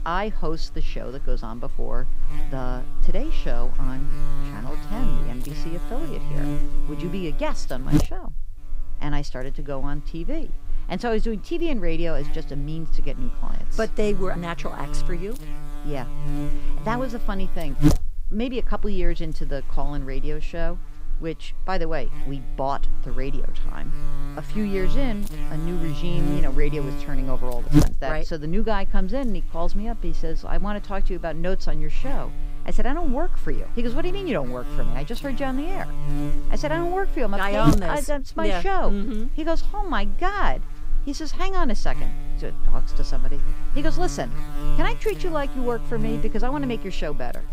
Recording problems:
electrical hum; loud; throughout; 60 Hz, 7 dB below the speech

